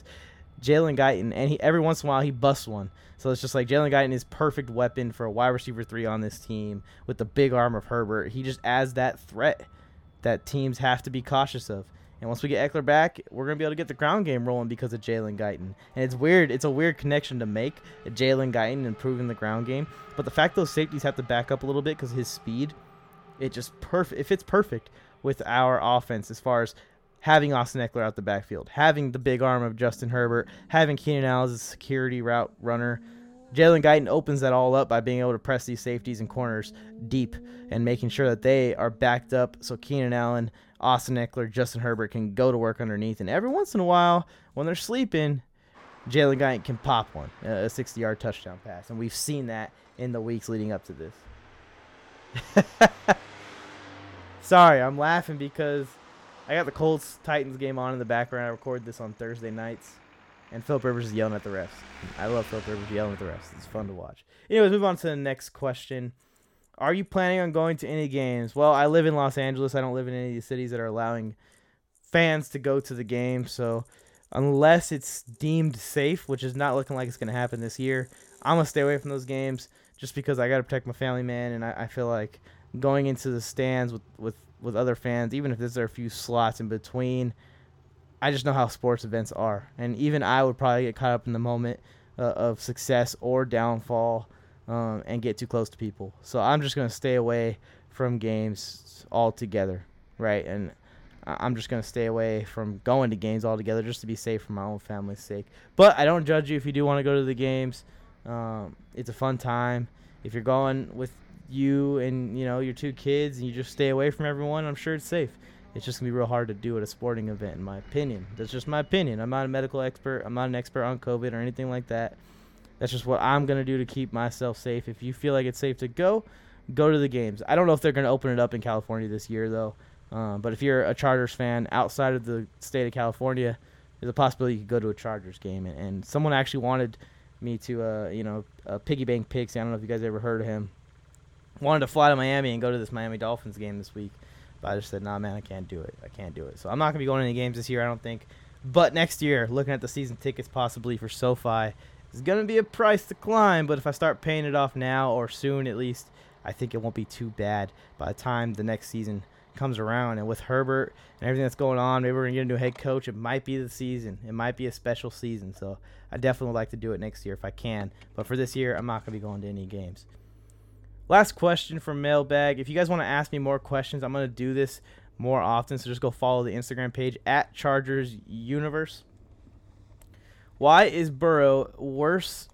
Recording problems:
traffic noise; faint; throughout; 25 dB below the speech

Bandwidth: 17 kHz